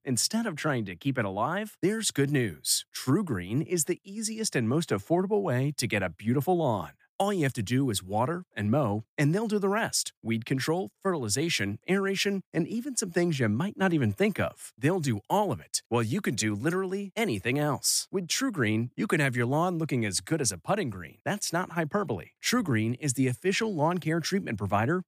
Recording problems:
none

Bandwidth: 15 kHz